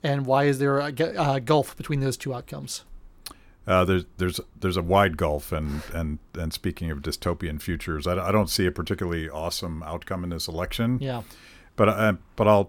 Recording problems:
none

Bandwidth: 18 kHz